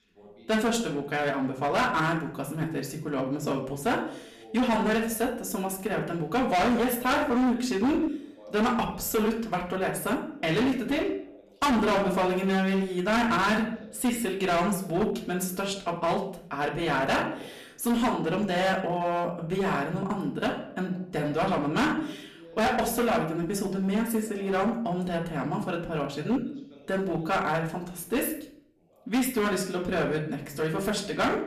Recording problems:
distortion; heavy; 13% of the sound clipped
off-mic speech; far
room echo; slight; dies away in 0.5 s
voice in the background; faint; throughout; 25 dB below the speech

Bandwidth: 14.5 kHz